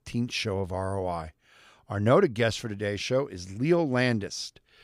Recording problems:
none

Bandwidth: 15 kHz